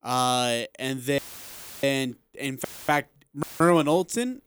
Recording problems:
audio cutting out; filled with static; at 1 s for 0.5 s, at 2.5 s and at 3.5 s

